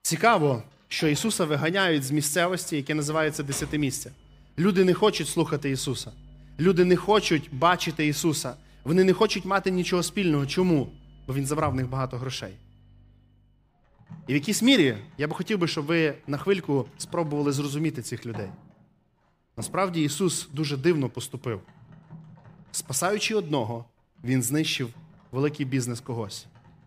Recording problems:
household noises; faint; throughout; 25 dB below the speech

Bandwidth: 15 kHz